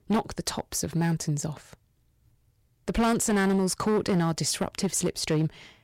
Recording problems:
distortion; slight; 7% of the sound clipped

